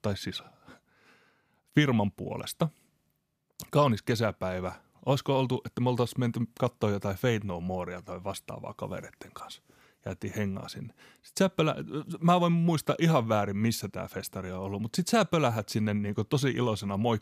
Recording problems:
none

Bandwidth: 14.5 kHz